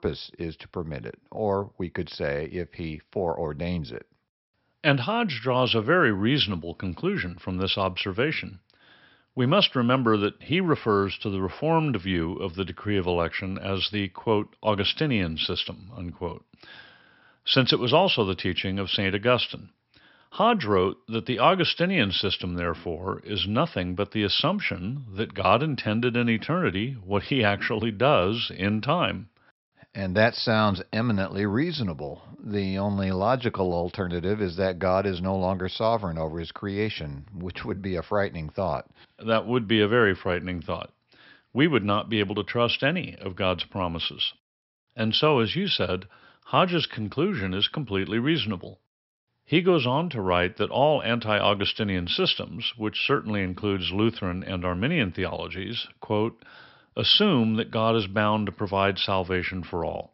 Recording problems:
high frequencies cut off; noticeable; nothing above 5.5 kHz

